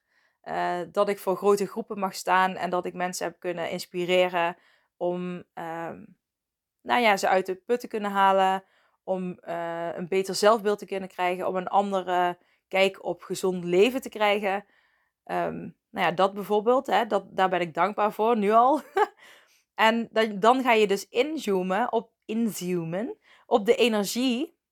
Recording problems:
none

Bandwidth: 18.5 kHz